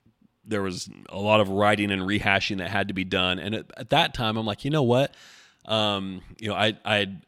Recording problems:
none

